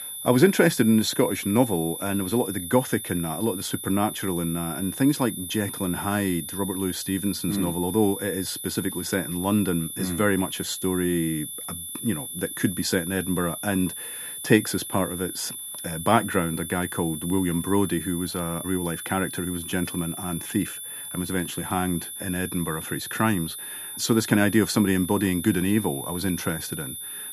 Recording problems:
high-pitched whine; loud; throughout; 10 kHz, 7 dB below the speech

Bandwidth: 14.5 kHz